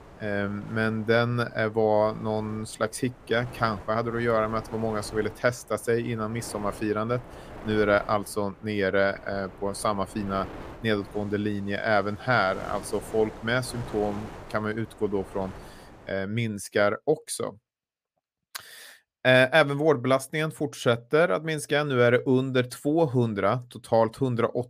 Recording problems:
wind noise on the microphone; occasional gusts; until 16 s; 20 dB below the speech

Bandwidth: 15 kHz